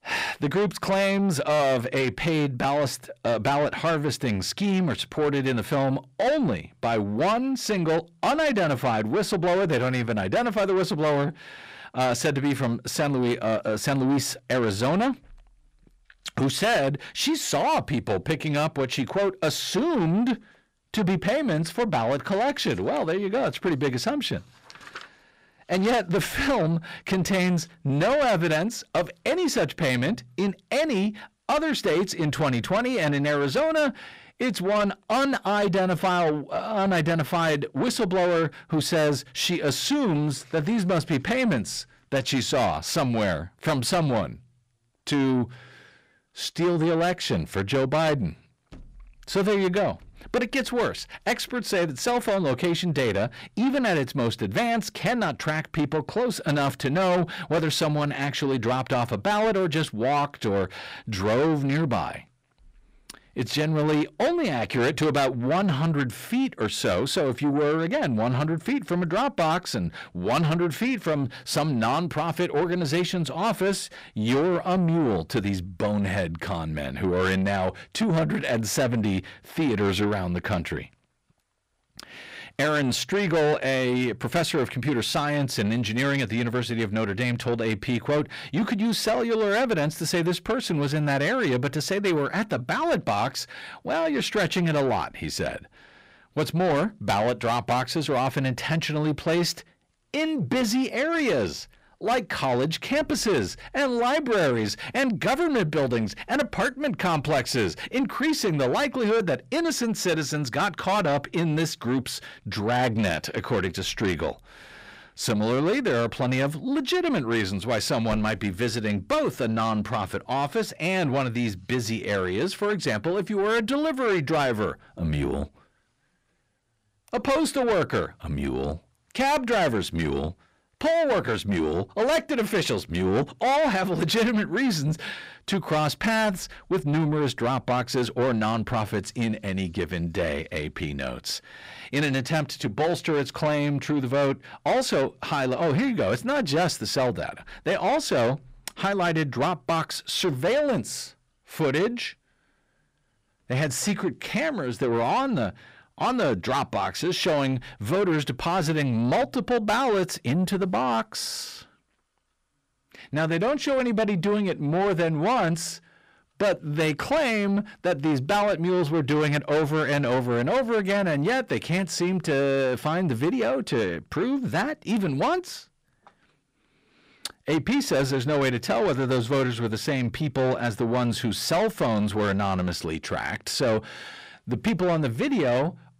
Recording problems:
distortion; heavy; 8 dB below the speech

